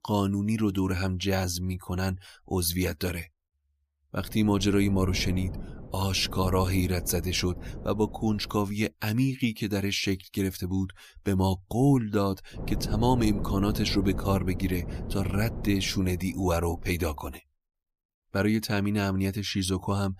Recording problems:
wind noise on the microphone; occasional gusts; from 4 to 8.5 s and from 13 to 17 s; 15 dB below the speech

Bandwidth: 15 kHz